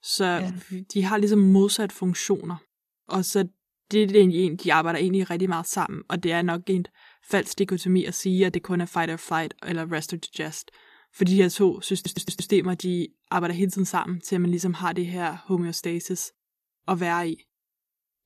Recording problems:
audio stuttering; at 12 s

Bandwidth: 14 kHz